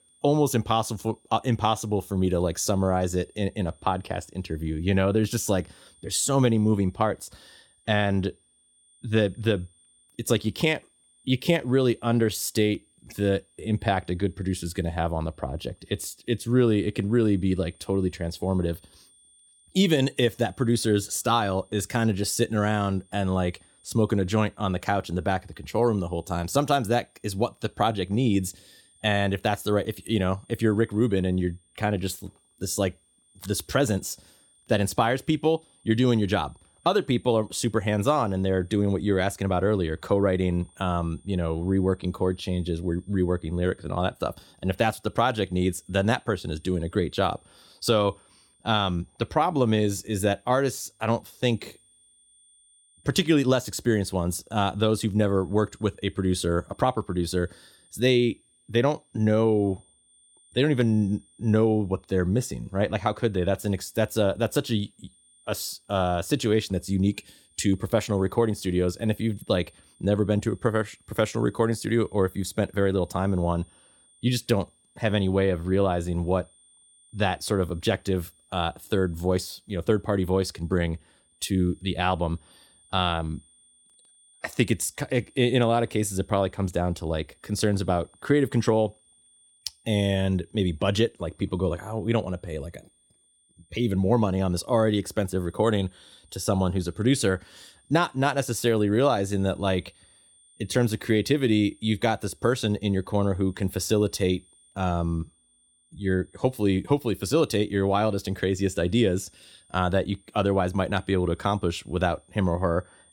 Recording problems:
high-pitched whine; faint; throughout; 9 kHz, 35 dB below the speech

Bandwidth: 17.5 kHz